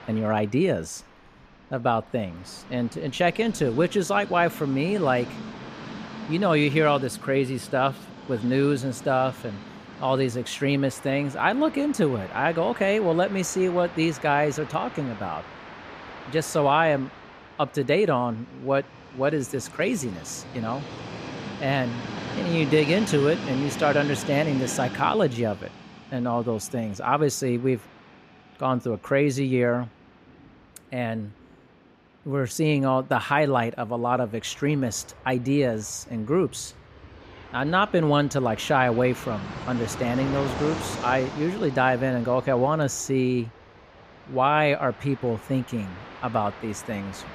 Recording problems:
train or aircraft noise; noticeable; throughout; 15 dB below the speech

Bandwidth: 14.5 kHz